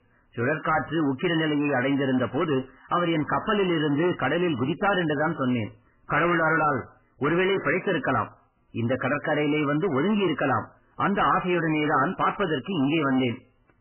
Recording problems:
distortion; heavy; 18% of the sound clipped
garbled, watery; badly; nothing above 3 kHz

